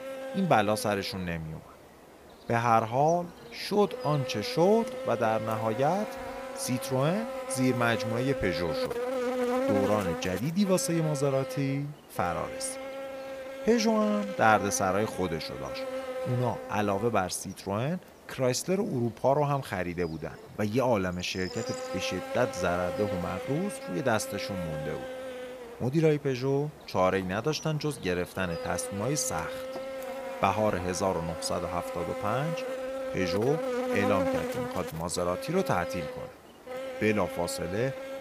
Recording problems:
electrical hum; loud; throughout; 50 Hz, 6 dB below the speech

